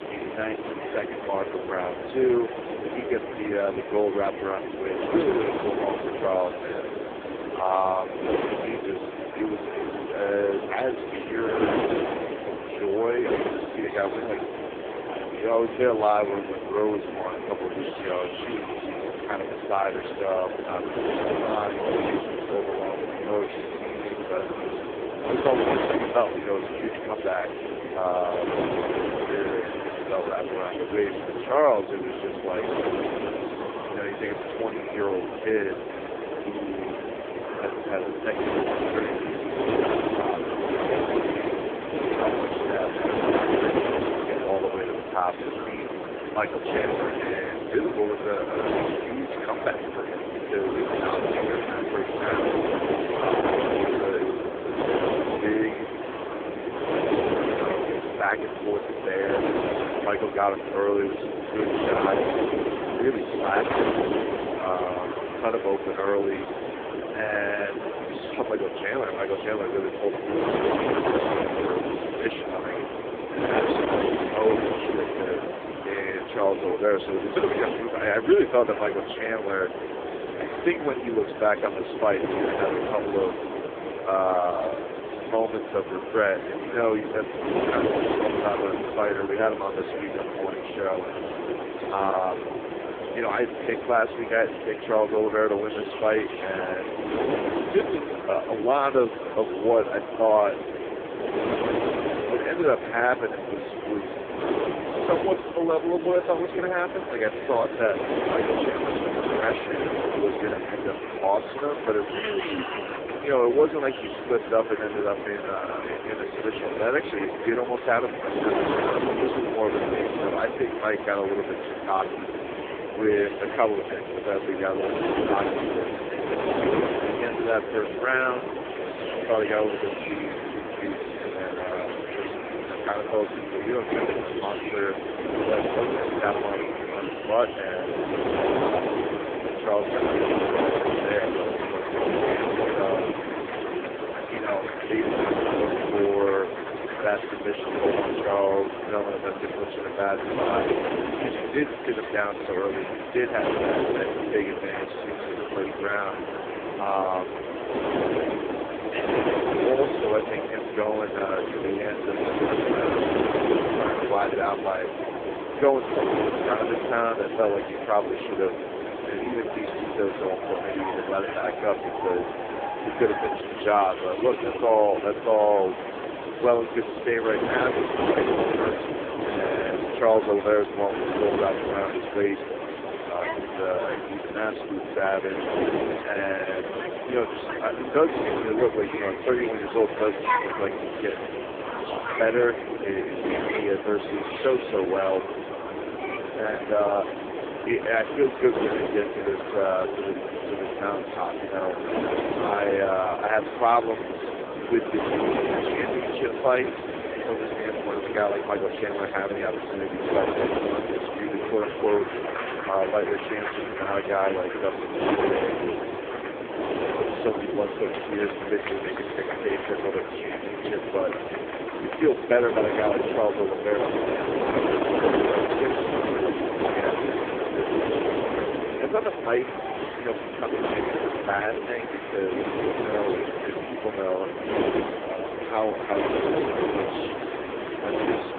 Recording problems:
phone-call audio; poor line
distortion; slight; 15 dB below the speech
wind noise on the microphone; heavy; 4 dB below the speech
murmuring crowd; loud; throughout; 9 dB below the speech

